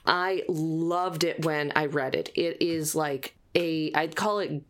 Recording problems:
squashed, flat; somewhat

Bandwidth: 16.5 kHz